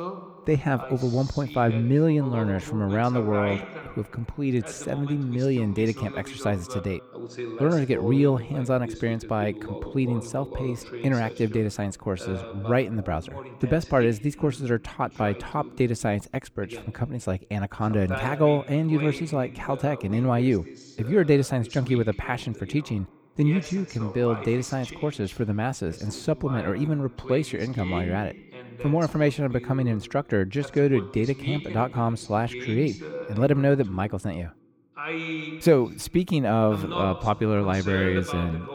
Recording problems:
voice in the background; noticeable; throughout; 10 dB below the speech

